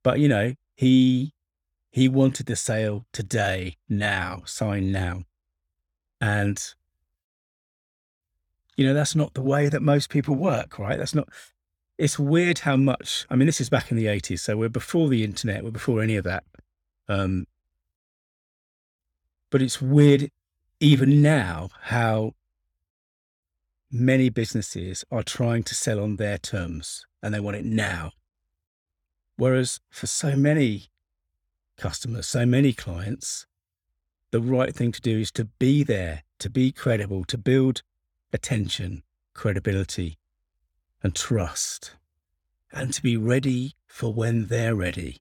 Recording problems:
none

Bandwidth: 18.5 kHz